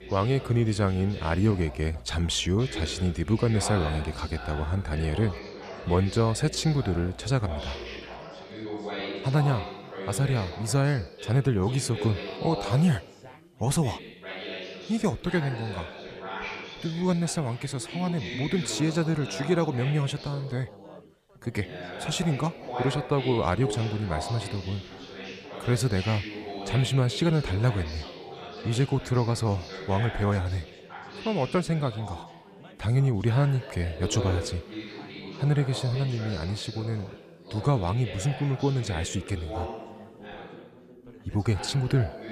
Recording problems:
chatter from many people; noticeable; throughout; 10 dB below the speech

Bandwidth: 14.5 kHz